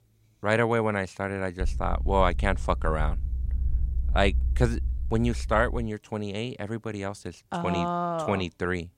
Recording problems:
low rumble; faint; from 1.5 to 6 s; 25 dB below the speech

